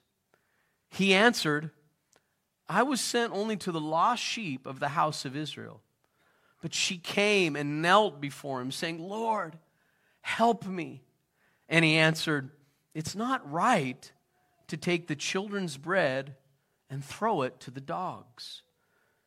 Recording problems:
none

